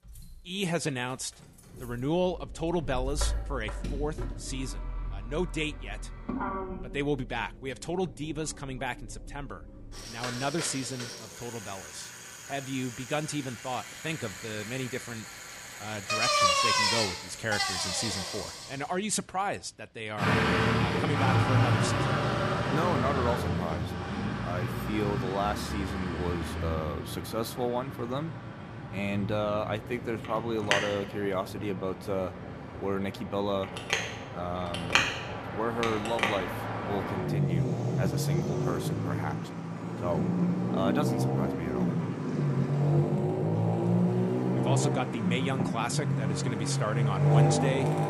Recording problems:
traffic noise; very loud; throughout; 4 dB above the speech

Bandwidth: 14.5 kHz